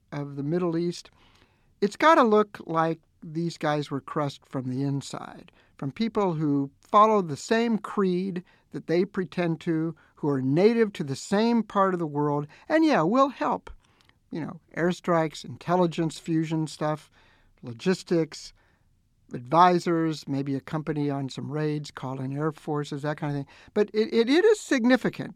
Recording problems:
none

